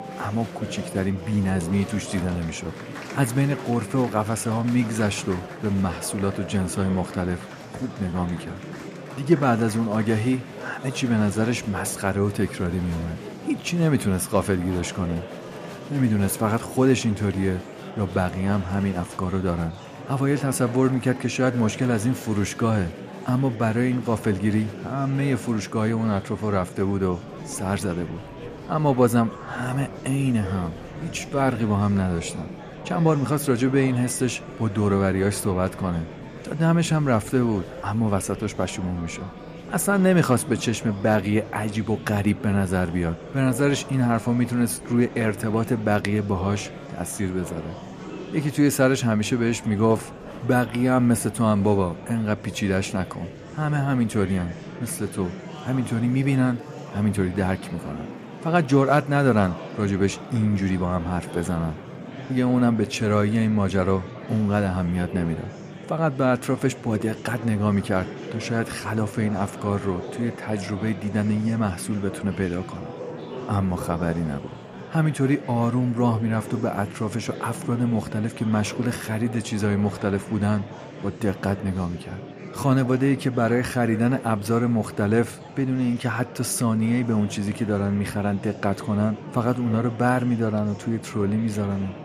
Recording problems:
murmuring crowd; noticeable; throughout; 15 dB below the speech

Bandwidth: 14.5 kHz